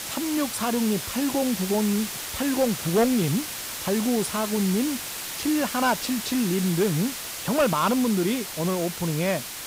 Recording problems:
hiss; loud; throughout; 6 dB below the speech

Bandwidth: 15.5 kHz